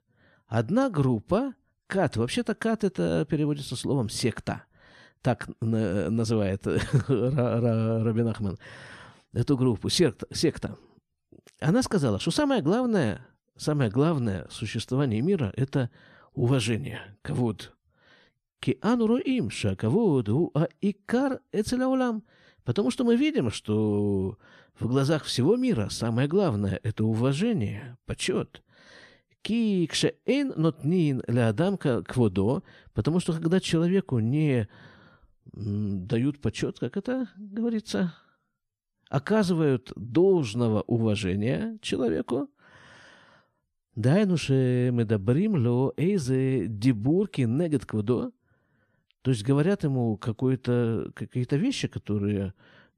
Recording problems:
none

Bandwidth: 13.5 kHz